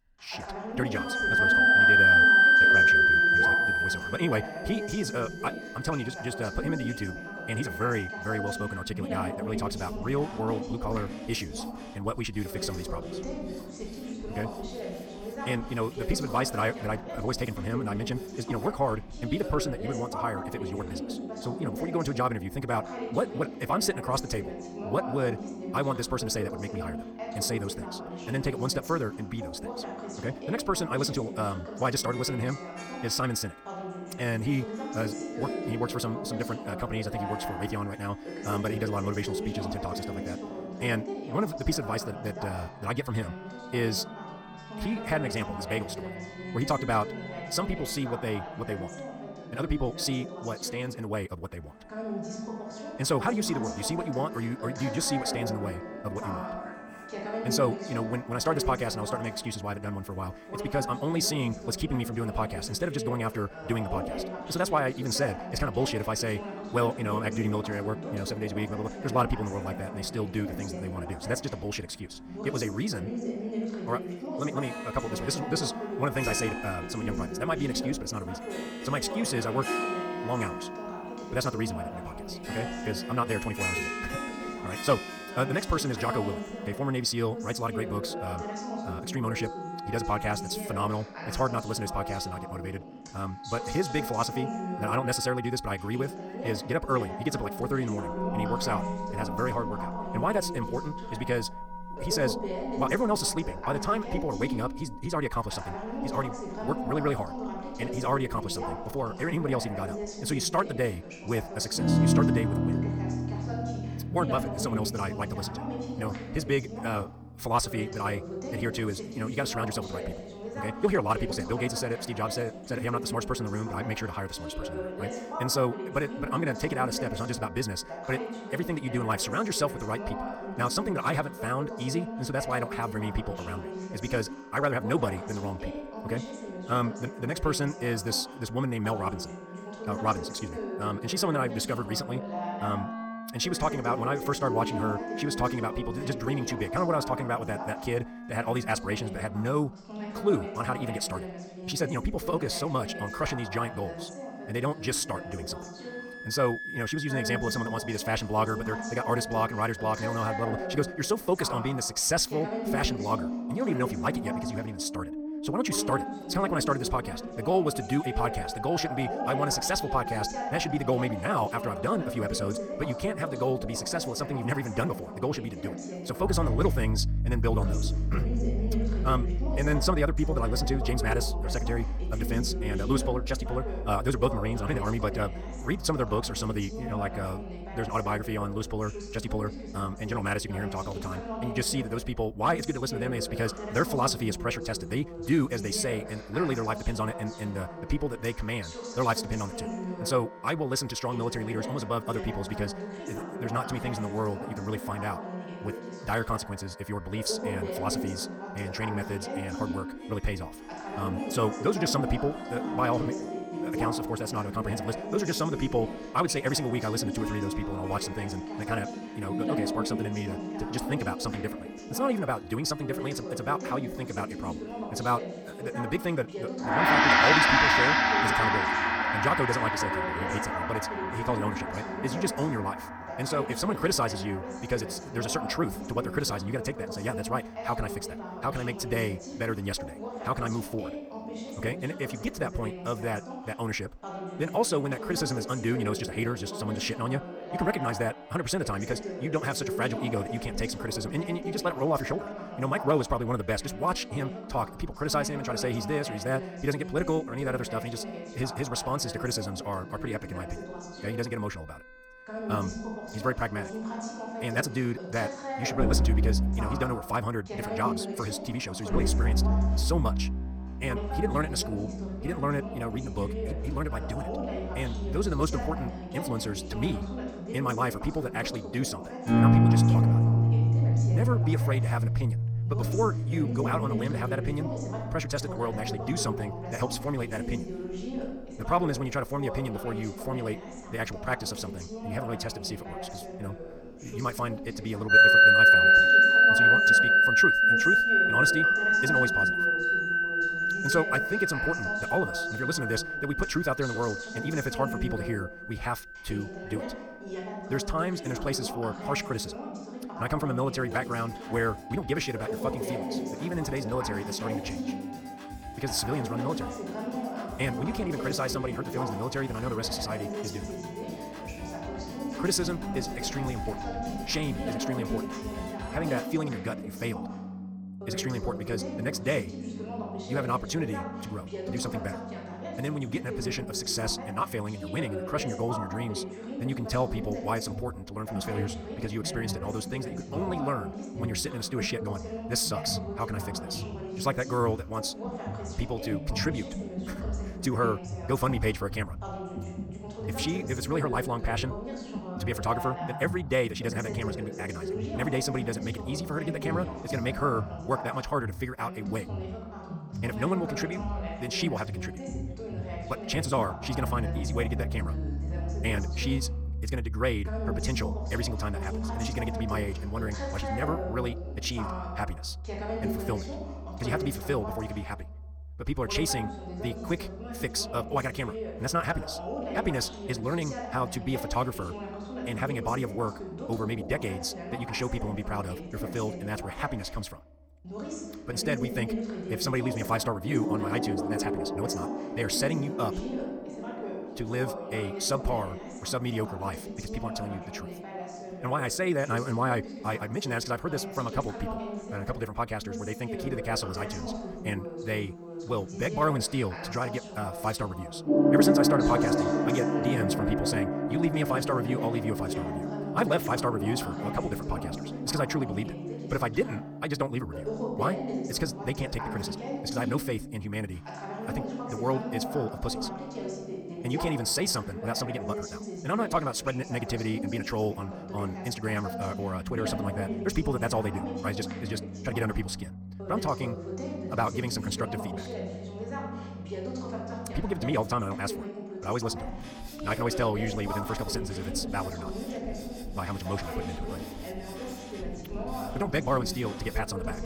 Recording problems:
wrong speed, natural pitch; too fast; 1.8 times normal speed
background music; very loud; throughout; 2 dB above the speech
voice in the background; loud; throughout; 6 dB below the speech

